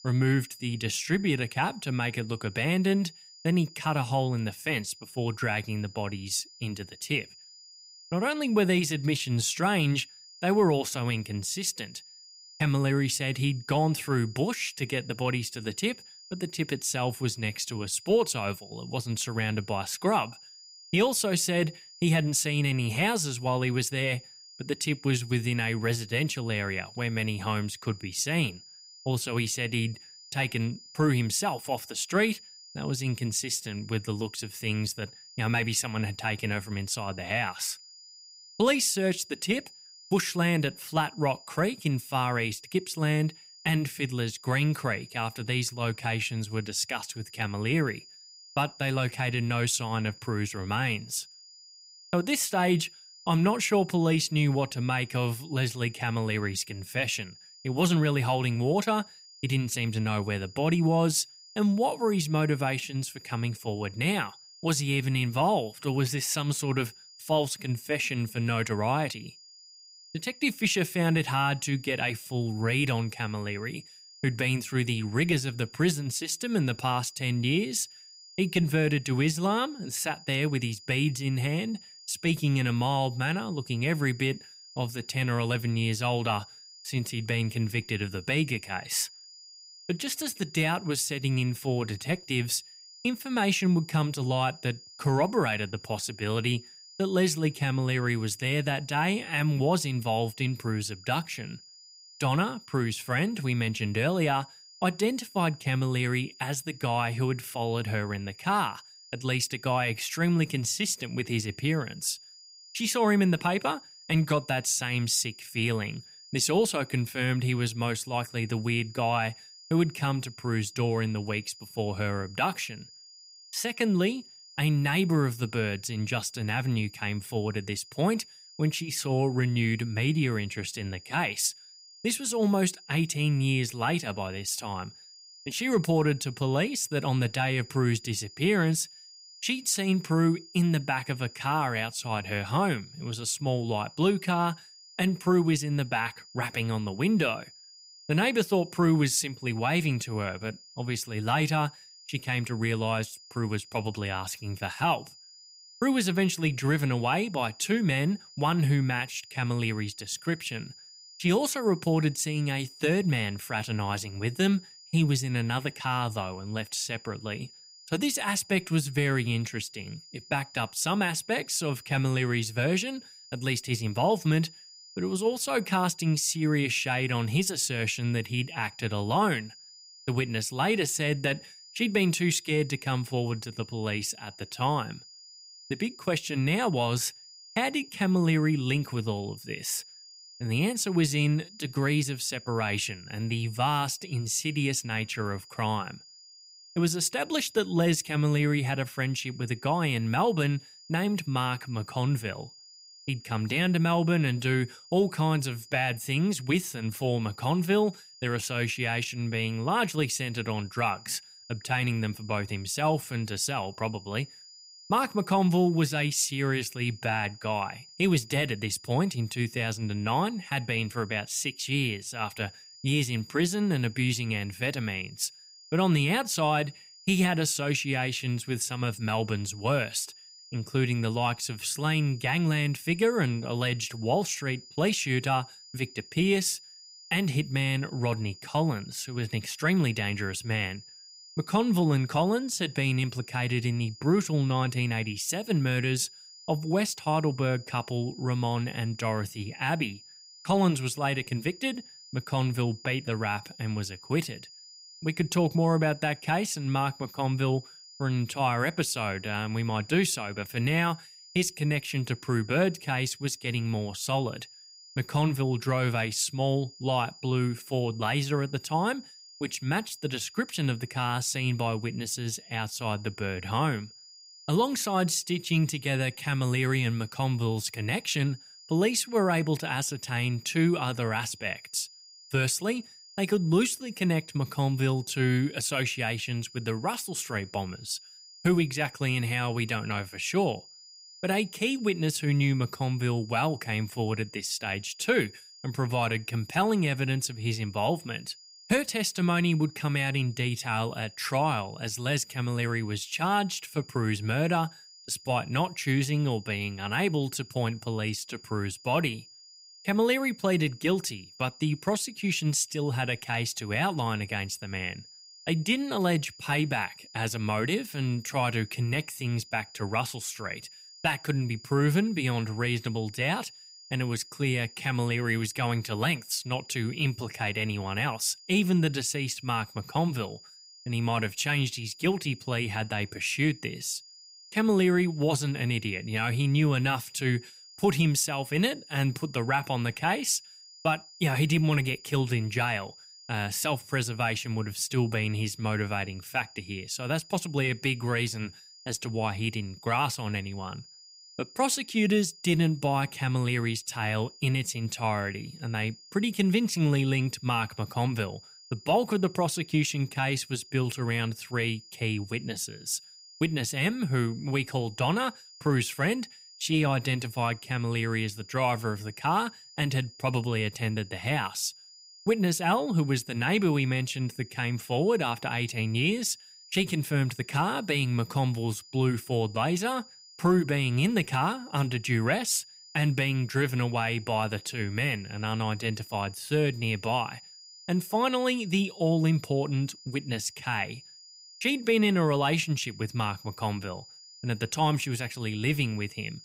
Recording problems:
high-pitched whine; noticeable; throughout; 5 kHz, 20 dB below the speech

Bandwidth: 15.5 kHz